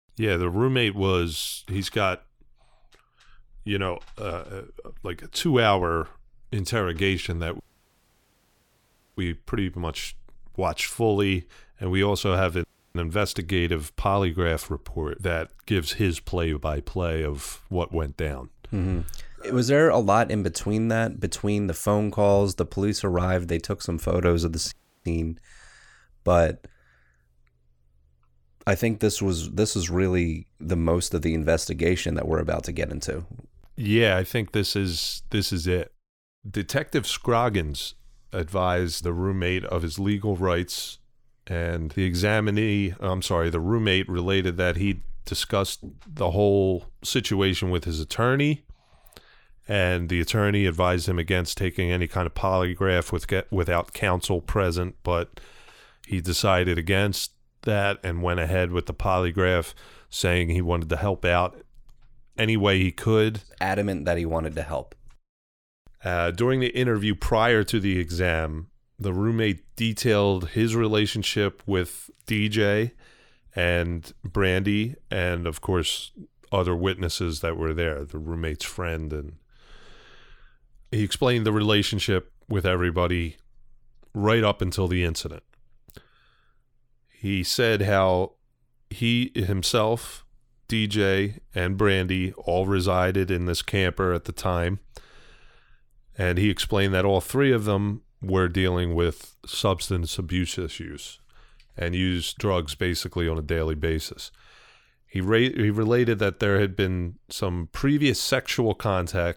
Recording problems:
audio cutting out; at 7.5 s for 1.5 s, at 13 s and at 25 s

